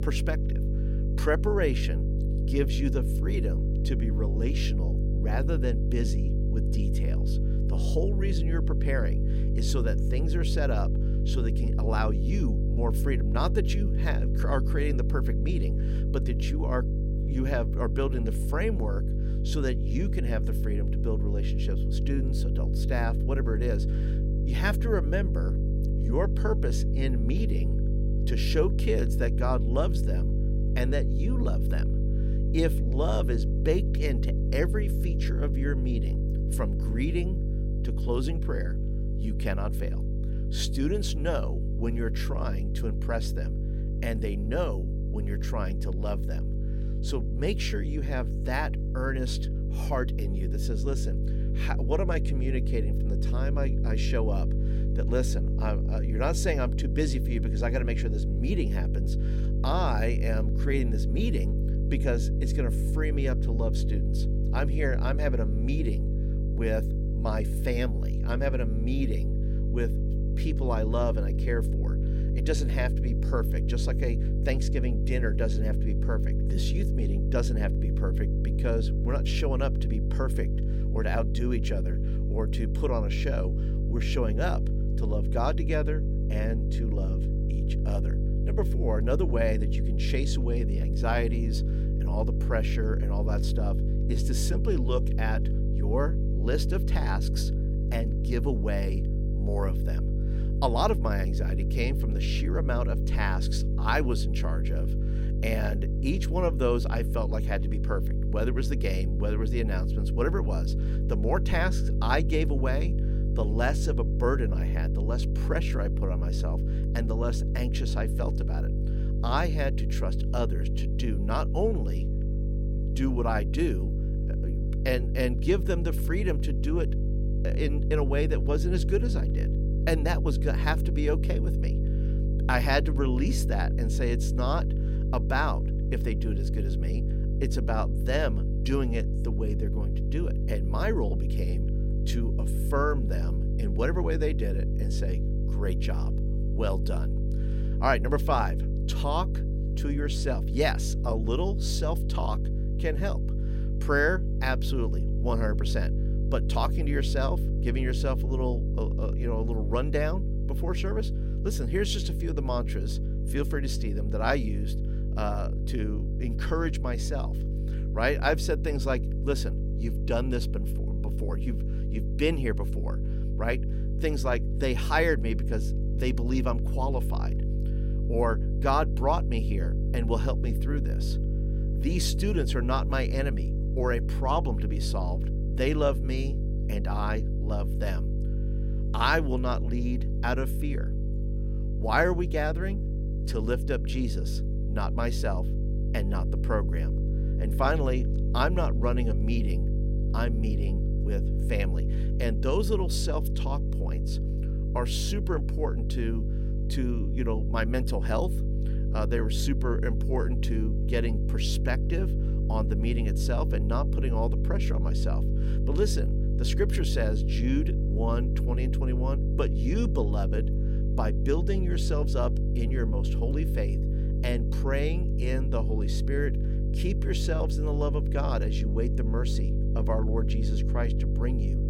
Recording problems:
electrical hum; loud; throughout; 50 Hz, 8 dB below the speech

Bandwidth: 16 kHz